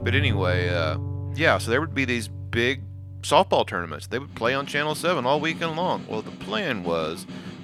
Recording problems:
background music; loud; throughout; 9 dB below the speech

